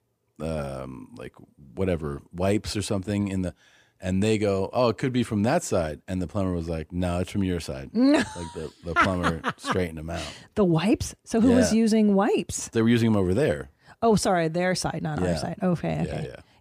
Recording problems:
none

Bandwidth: 15 kHz